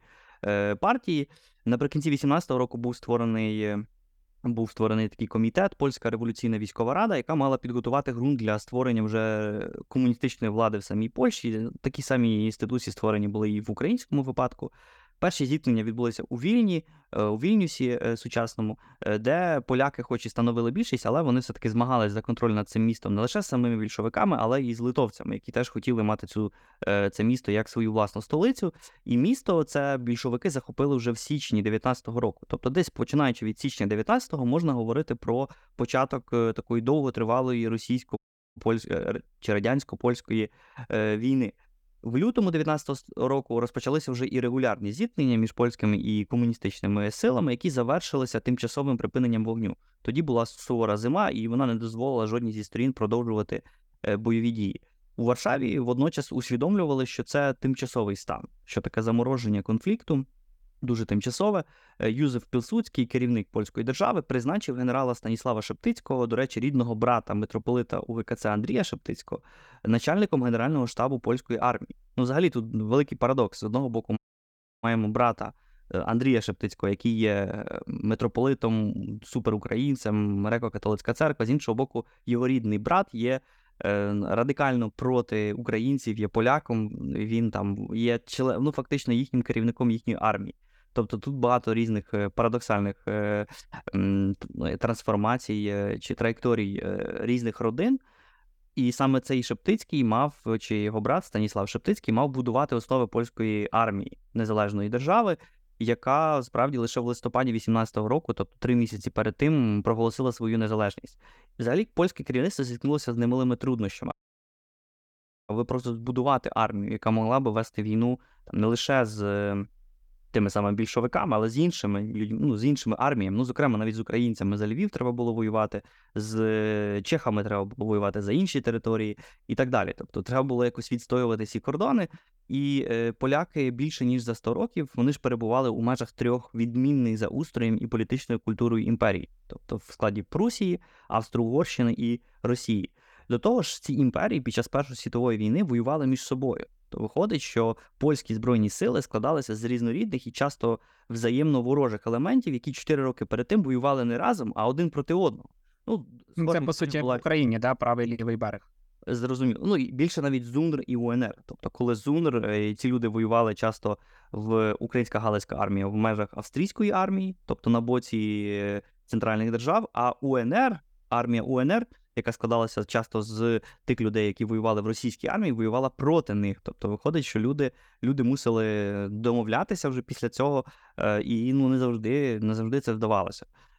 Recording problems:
audio cutting out; at 38 s, at 1:14 for 0.5 s and at 1:54 for 1.5 s

